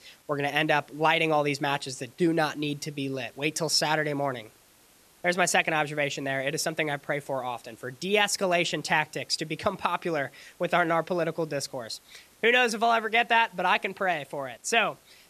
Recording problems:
hiss; faint; throughout; 30 dB below the speech

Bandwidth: 13.5 kHz